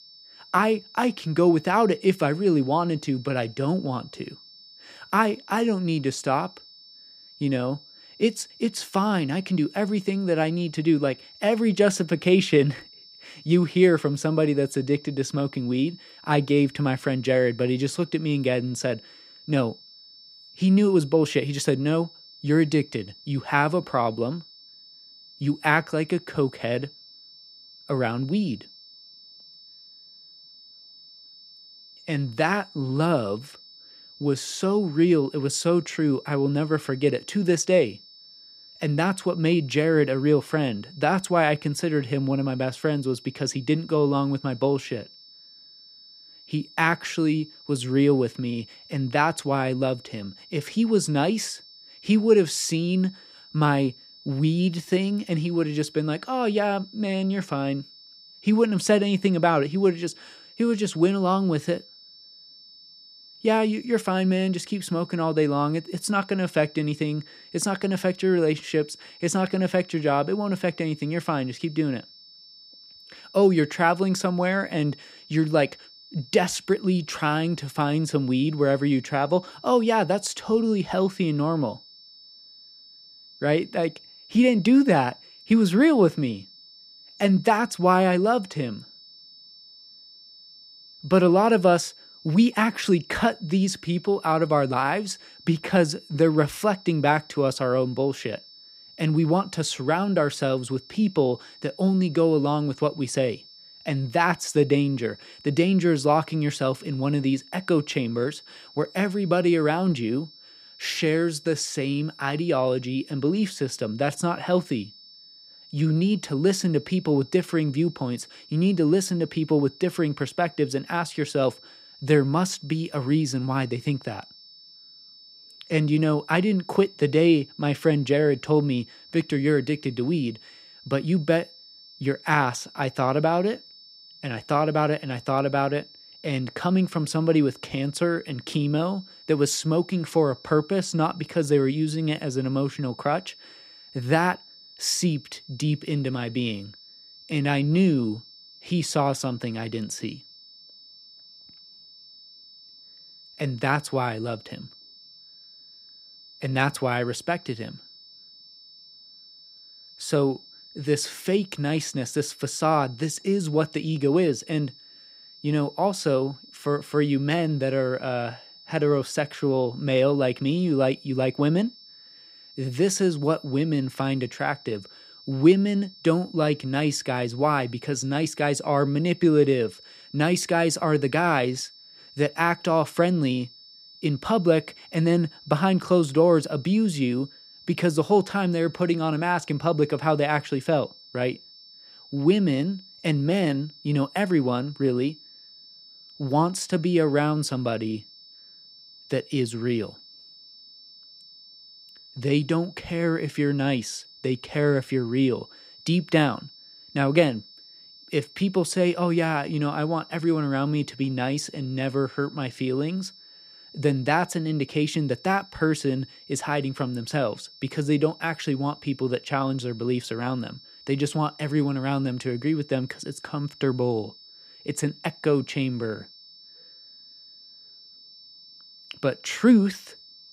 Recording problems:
high-pitched whine; faint; throughout; 5.5 kHz, 20 dB below the speech

